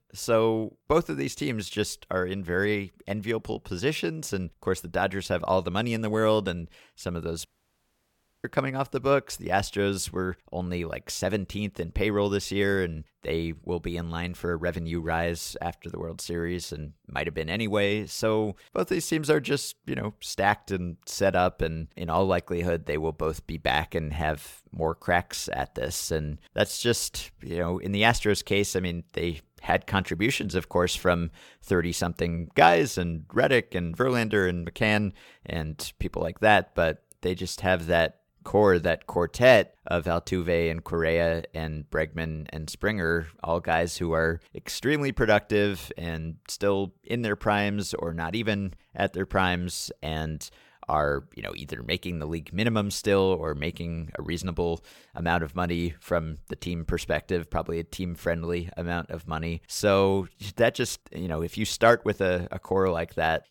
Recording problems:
audio cutting out; at 7.5 s for 1 s

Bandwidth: 17.5 kHz